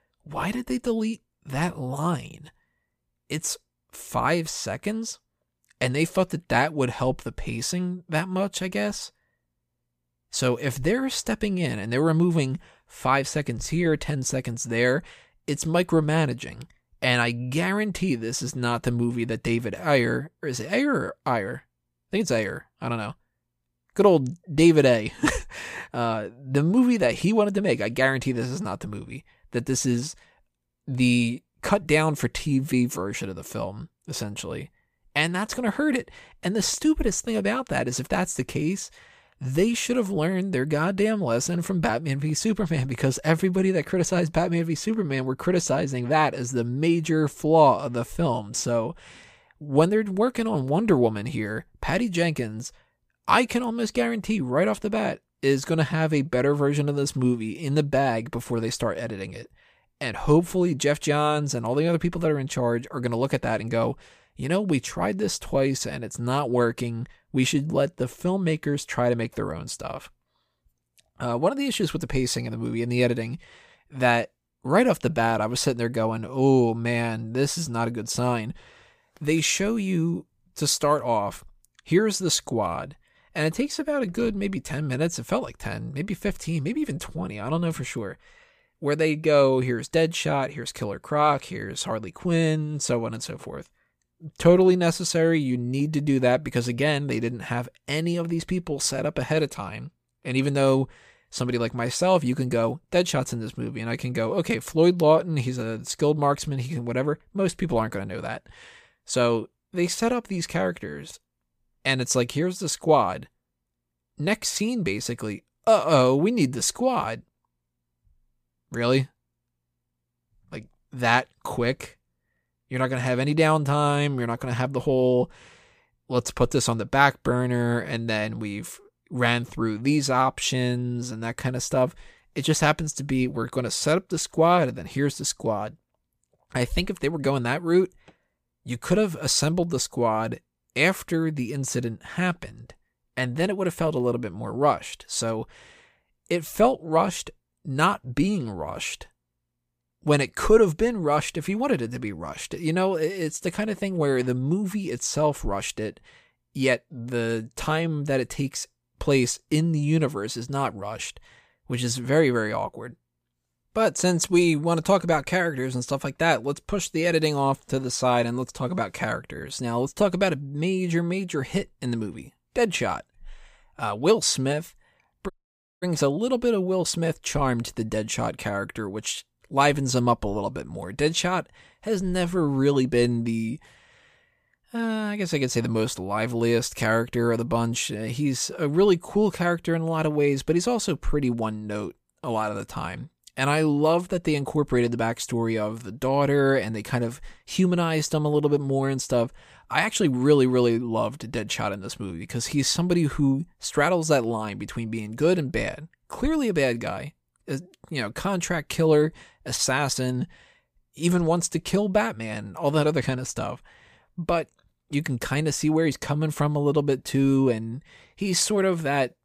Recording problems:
audio cutting out; at 2:55 for 0.5 s

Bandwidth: 15 kHz